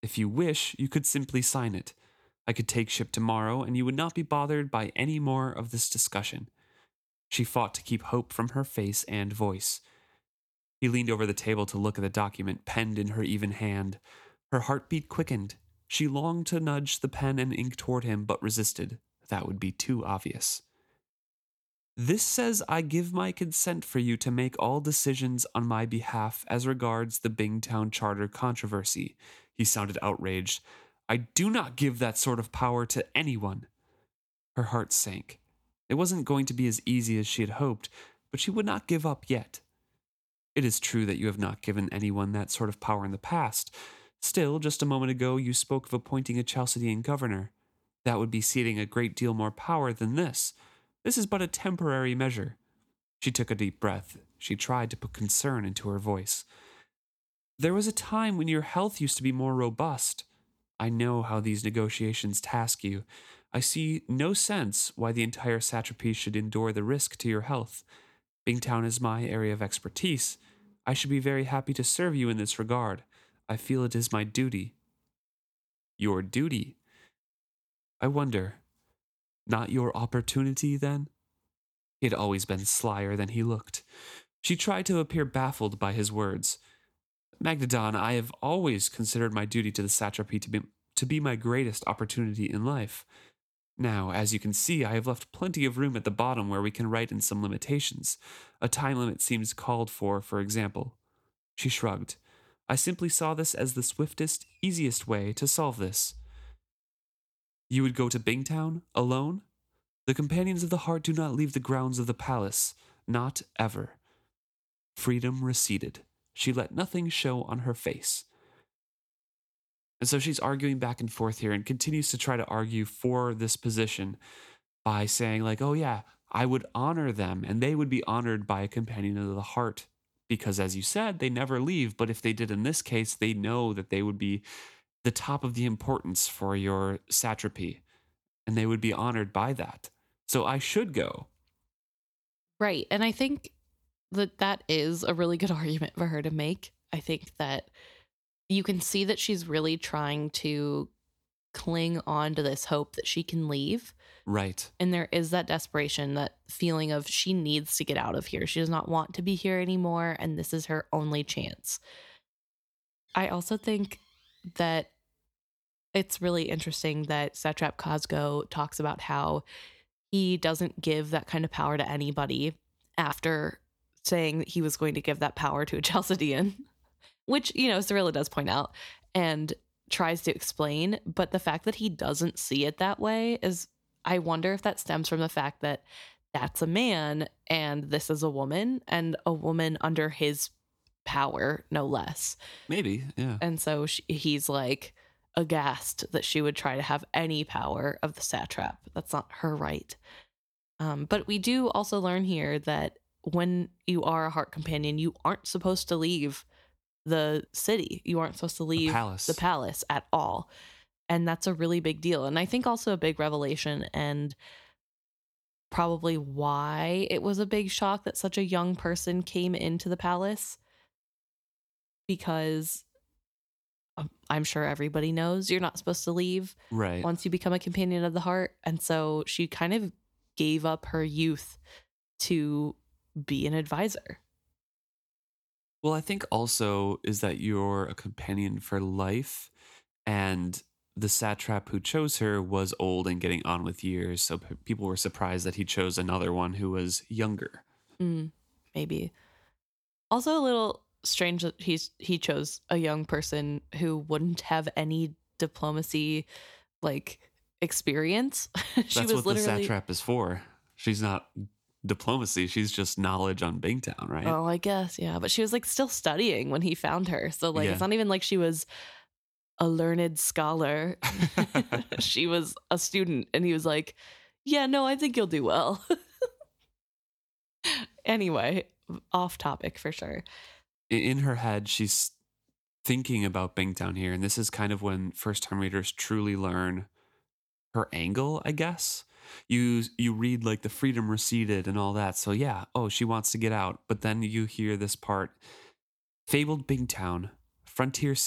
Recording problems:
abrupt cut into speech; at the end

